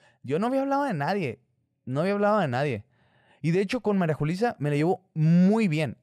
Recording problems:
none

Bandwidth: 14.5 kHz